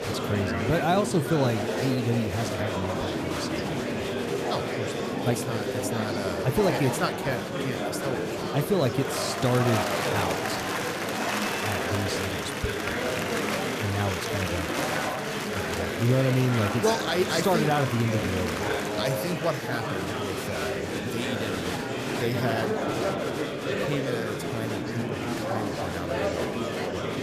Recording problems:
murmuring crowd; very loud; throughout; as loud as the speech

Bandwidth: 14.5 kHz